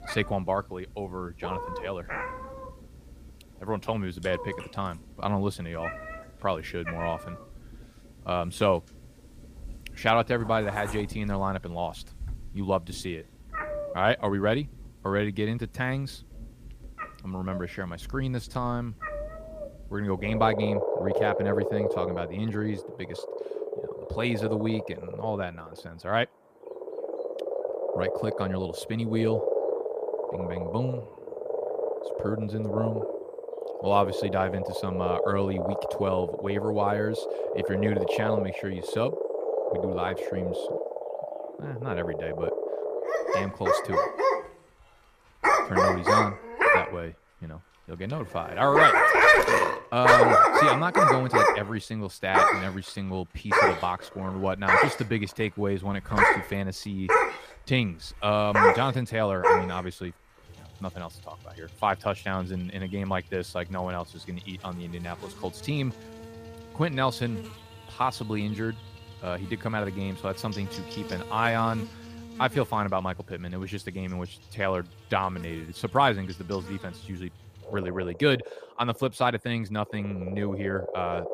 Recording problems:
animal sounds; very loud; throughout; 4 dB above the speech

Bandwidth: 15 kHz